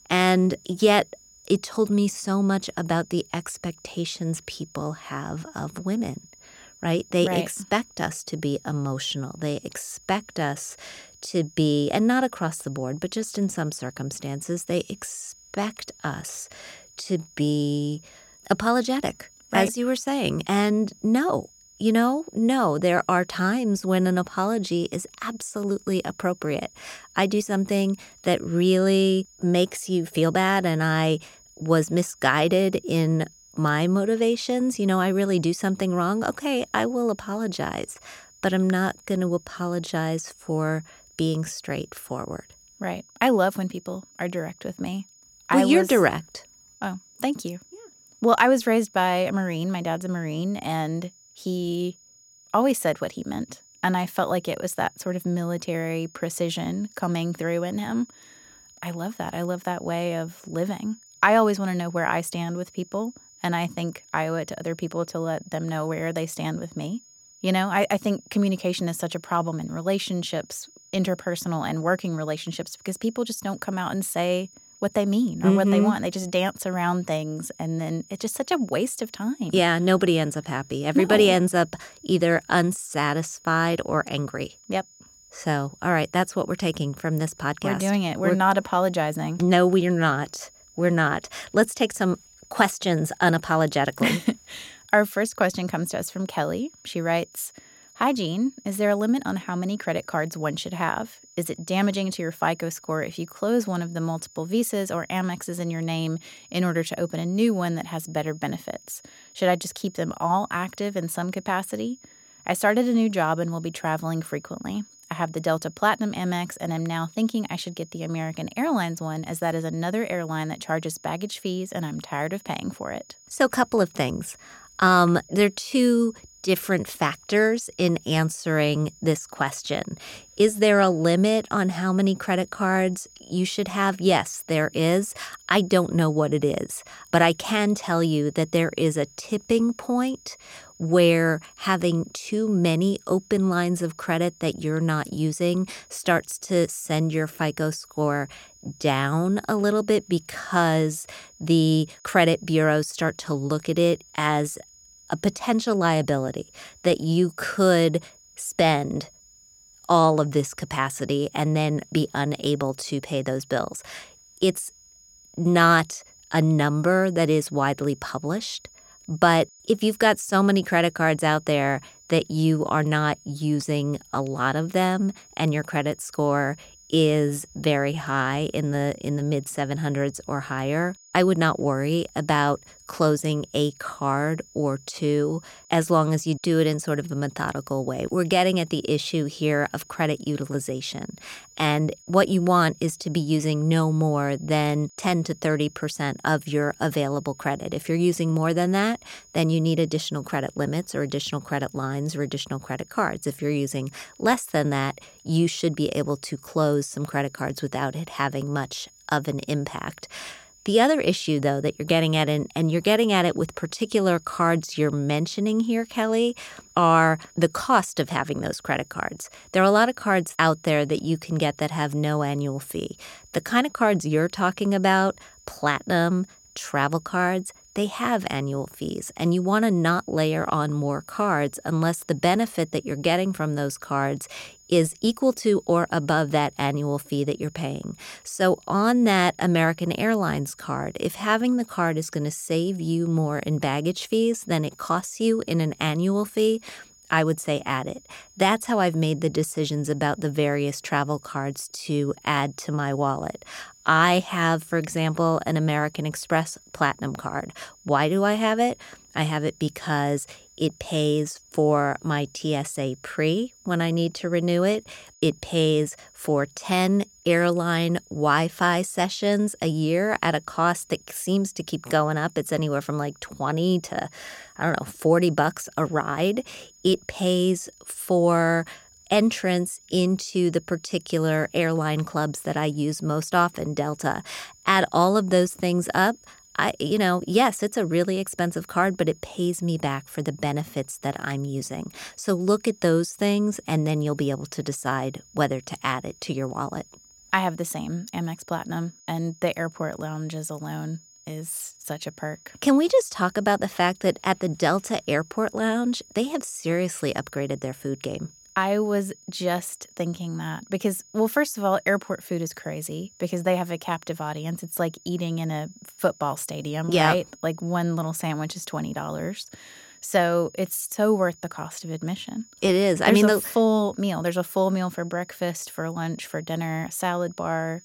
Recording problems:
high-pitched whine; faint; throughout; 6.5 kHz, 25 dB below the speech

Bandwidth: 16.5 kHz